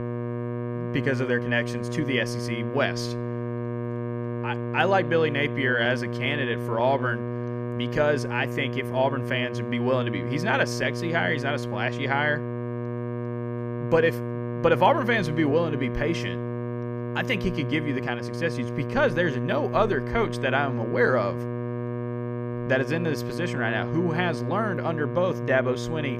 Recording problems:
electrical hum; loud; throughout; 60 Hz, 9 dB below the speech

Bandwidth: 14.5 kHz